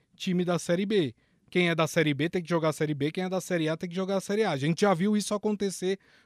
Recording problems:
none

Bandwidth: 14.5 kHz